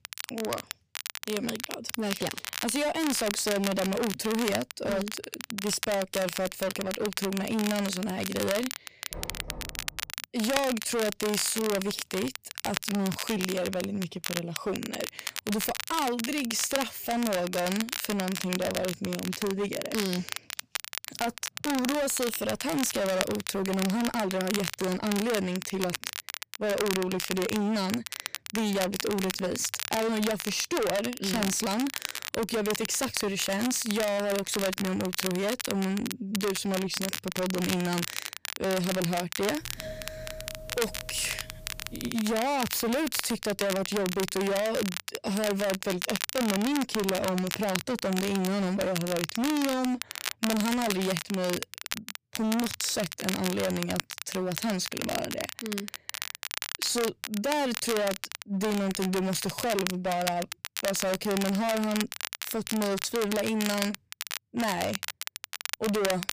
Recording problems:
distortion; heavy; 21% of the sound clipped
crackle, like an old record; loud; 5 dB below the speech
door banging; faint; at 9 s; peak 10 dB below the speech
doorbell; faint; from 40 to 42 s; peak 10 dB below the speech

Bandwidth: 15 kHz